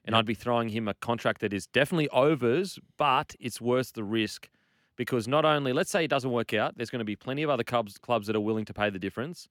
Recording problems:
none

